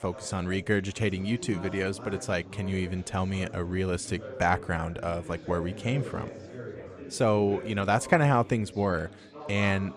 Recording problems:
chatter from many people; noticeable; throughout; 15 dB below the speech

